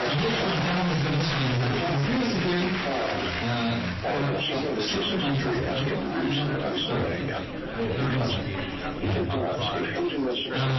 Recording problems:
distortion; heavy; 32% of the sound clipped
off-mic speech; far
room echo; noticeable; dies away in 0.6 s
garbled, watery; slightly; nothing above 5.5 kHz
chatter from many people; loud; throughout; as loud as the speech
uneven, jittery; strongly; from 1.5 to 9.5 s
abrupt cut into speech; at the end

